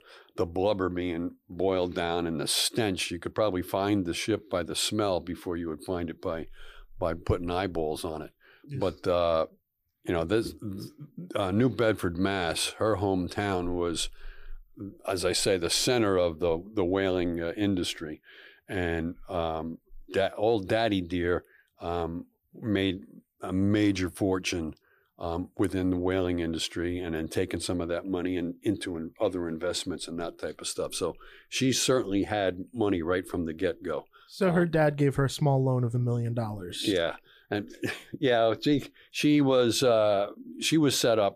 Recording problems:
none

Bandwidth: 15 kHz